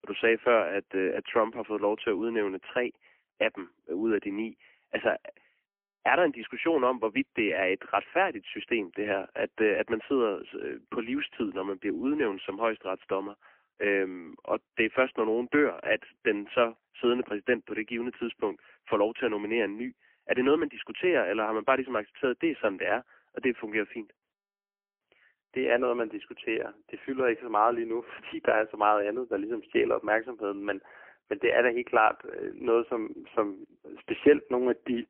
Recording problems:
phone-call audio; poor line; nothing above 3 kHz

